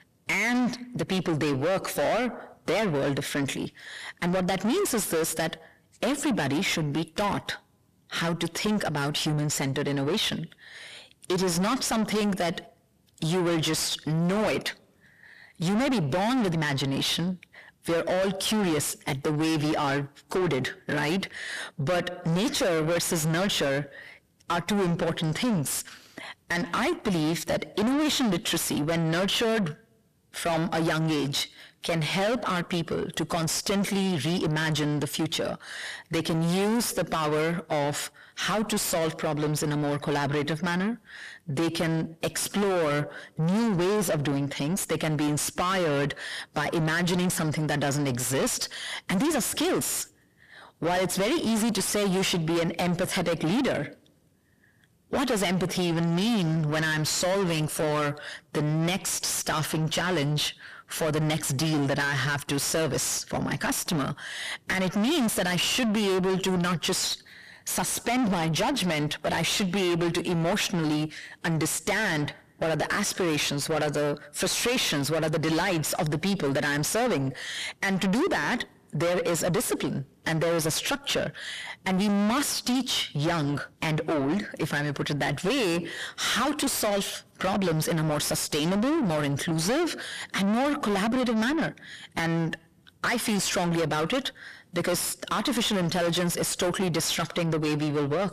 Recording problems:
distortion; heavy; 5 dB below the speech

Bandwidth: 14.5 kHz